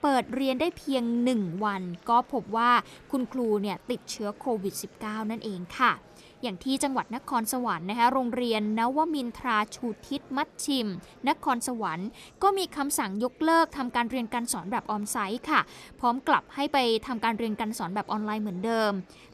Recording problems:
murmuring crowd; faint; throughout; 25 dB below the speech

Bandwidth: 13.5 kHz